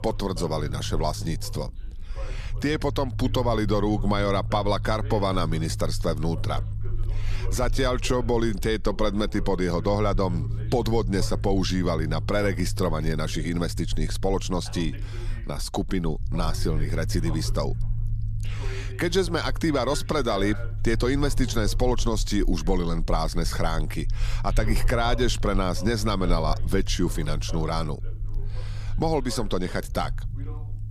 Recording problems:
voice in the background; noticeable; throughout; 20 dB below the speech
low rumble; faint; throughout; 20 dB below the speech

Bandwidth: 14.5 kHz